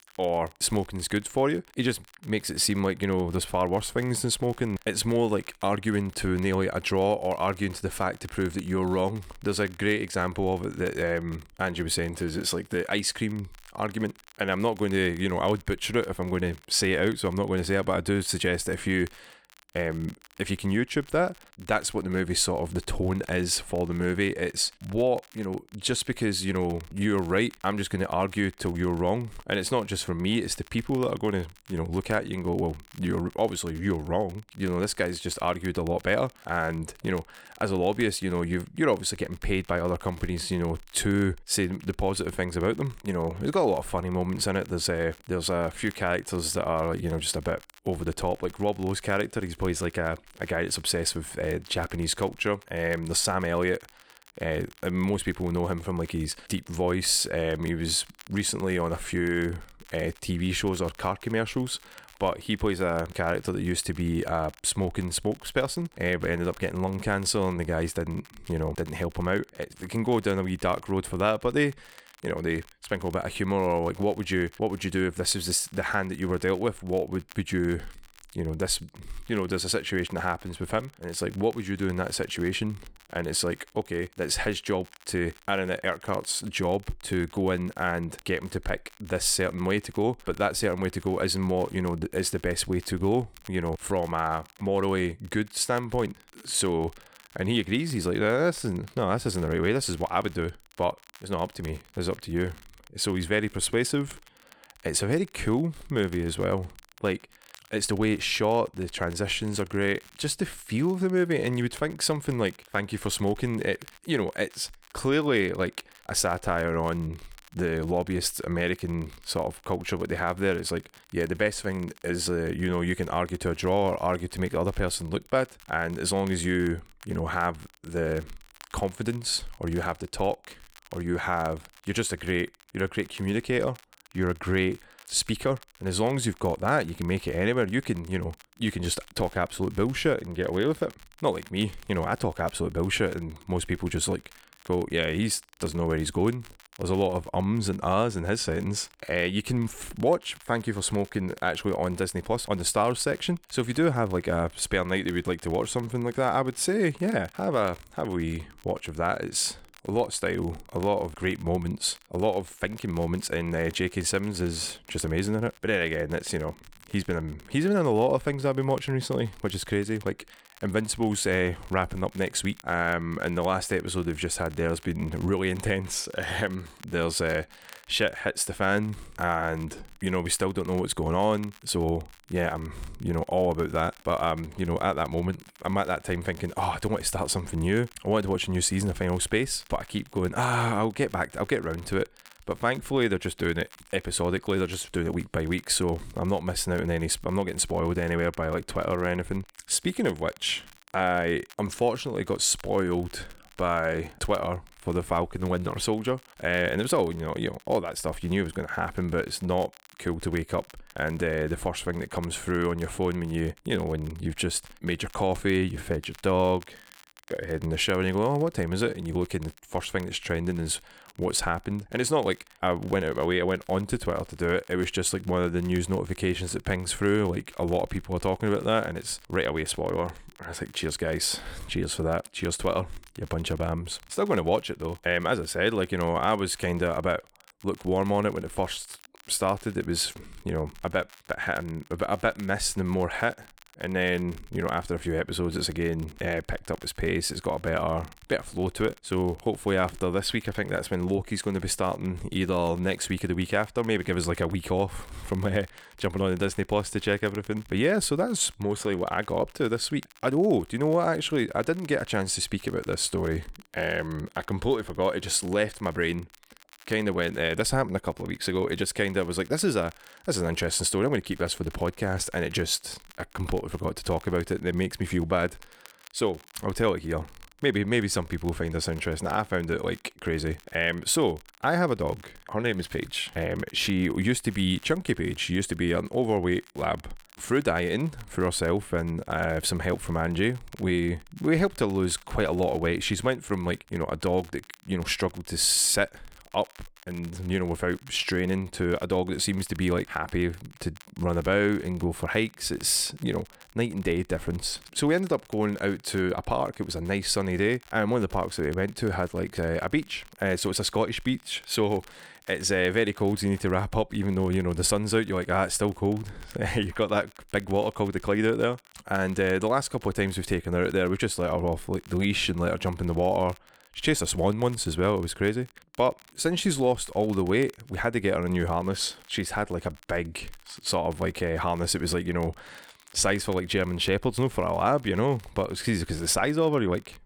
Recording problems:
crackle, like an old record; faint; 25 dB below the speech

